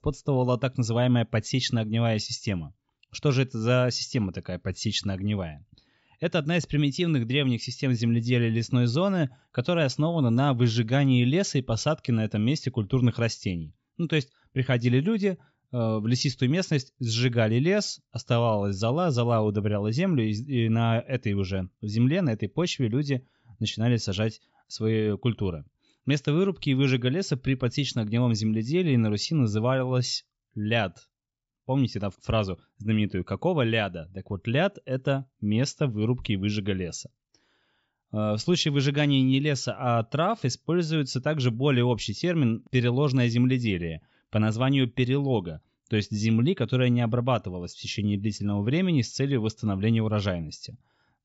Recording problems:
high frequencies cut off; noticeable; nothing above 8 kHz

